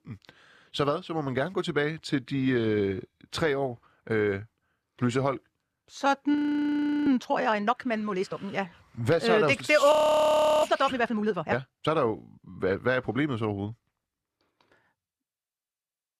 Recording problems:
audio freezing; at 6.5 s for 0.5 s and at 10 s for 0.5 s

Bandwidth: 14 kHz